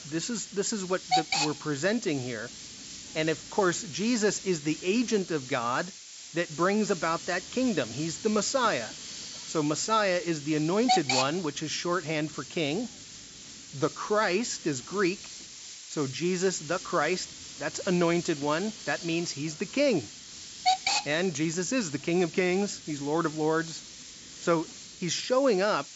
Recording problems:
high frequencies cut off; noticeable; nothing above 8 kHz
hiss; loud; throughout; 8 dB below the speech

